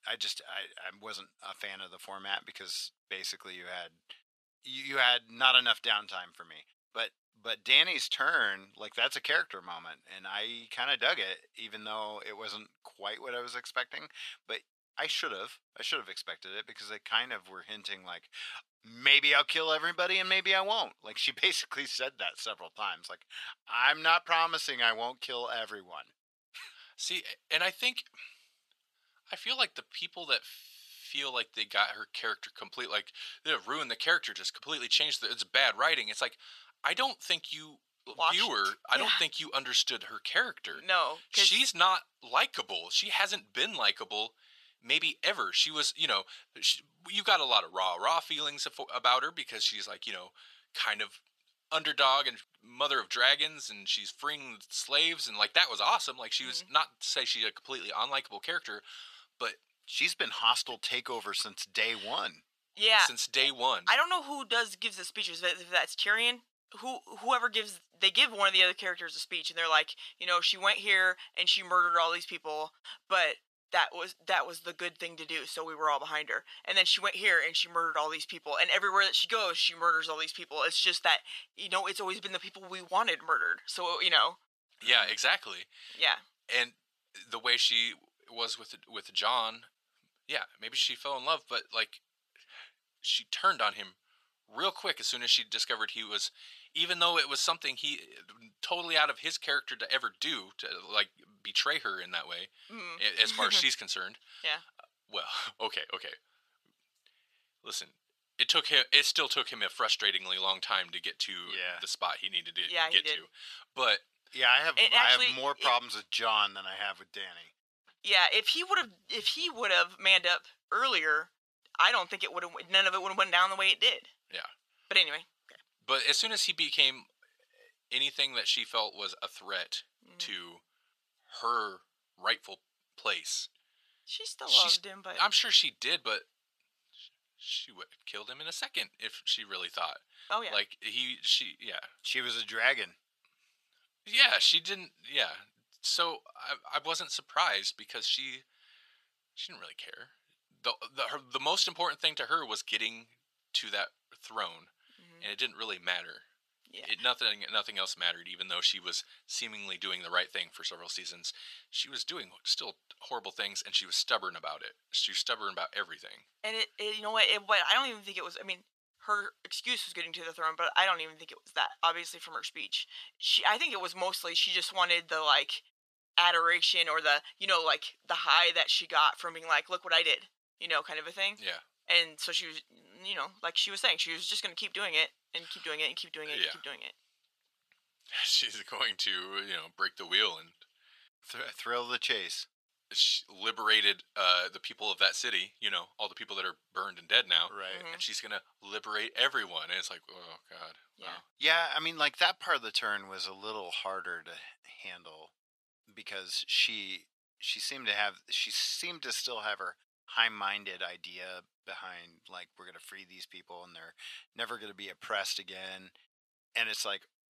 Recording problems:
thin; very; fading below 750 Hz

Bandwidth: 14 kHz